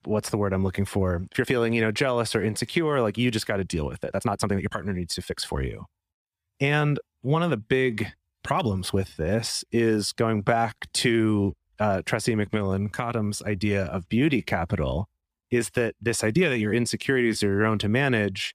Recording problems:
uneven, jittery; strongly; from 1.5 to 18 s

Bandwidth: 15 kHz